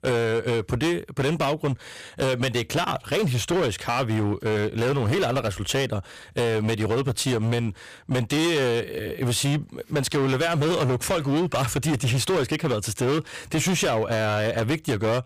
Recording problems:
distortion; heavy; 22% of the sound clipped

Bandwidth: 15 kHz